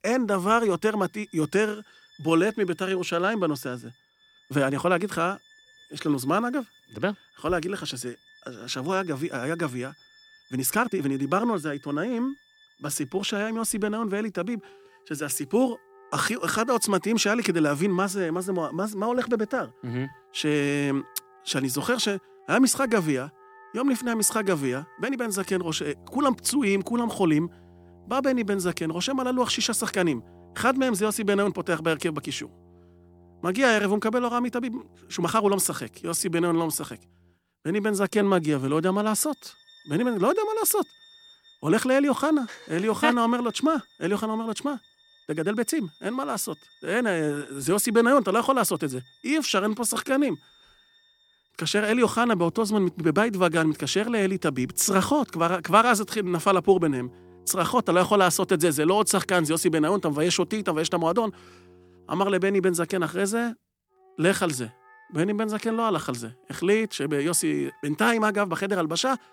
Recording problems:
background music; faint; throughout; 30 dB below the speech
uneven, jittery; strongly; from 4 s to 1:06

